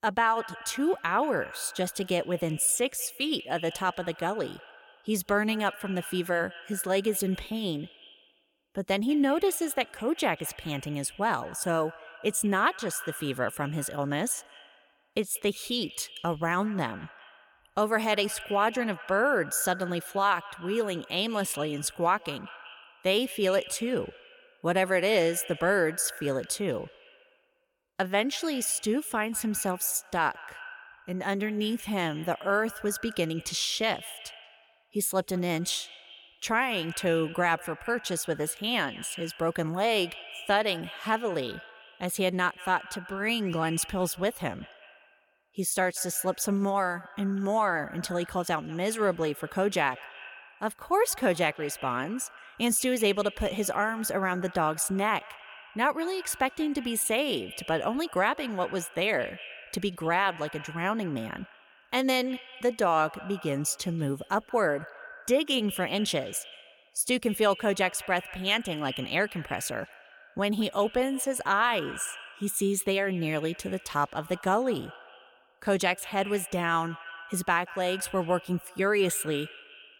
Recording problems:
echo of what is said; noticeable; throughout; 190 ms later, 15 dB below the speech

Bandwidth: 17 kHz